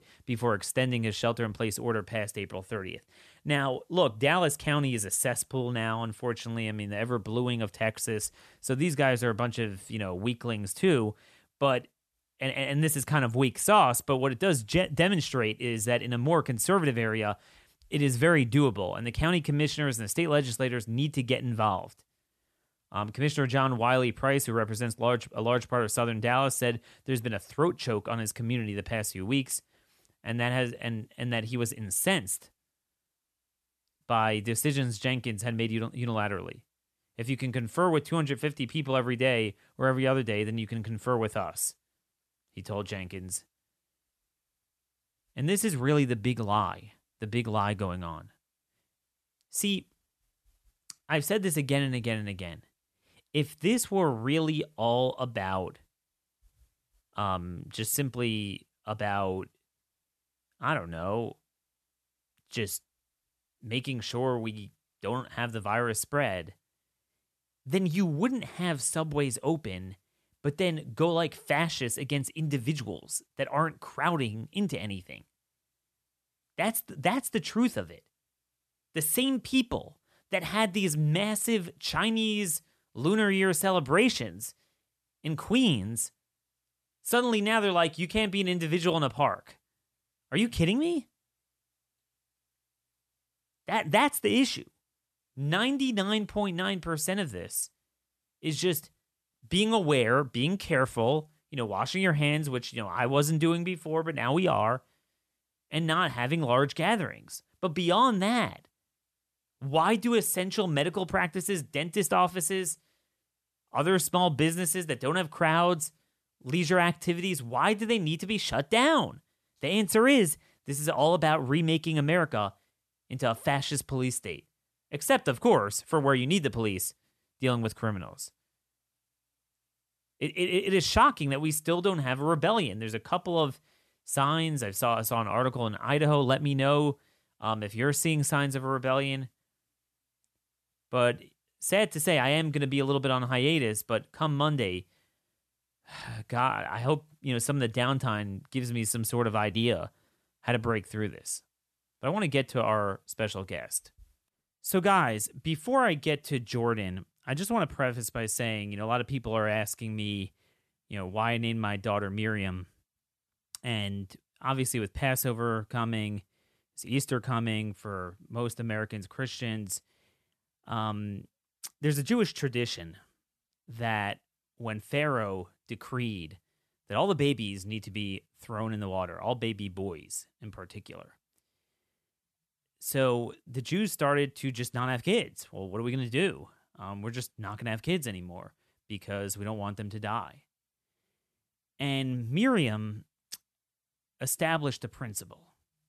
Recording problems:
none

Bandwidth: 13.5 kHz